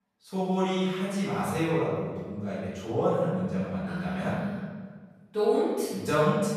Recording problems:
room echo; strong; dies away in 1.4 s
off-mic speech; far

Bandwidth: 14.5 kHz